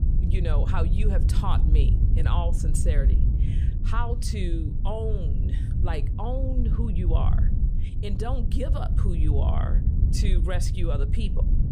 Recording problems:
wind noise on the microphone; heavy; 6 dB below the speech

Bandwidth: 15 kHz